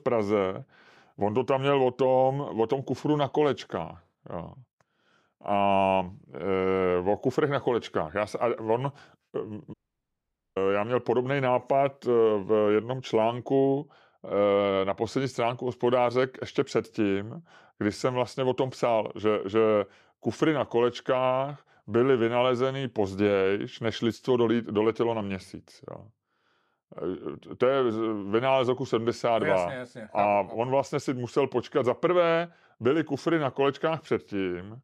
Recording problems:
audio cutting out; at 9.5 s for 1 s

